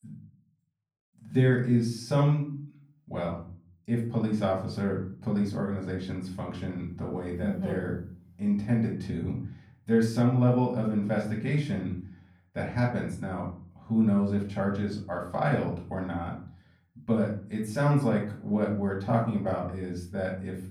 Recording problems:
off-mic speech; far
room echo; slight; dies away in 0.4 s

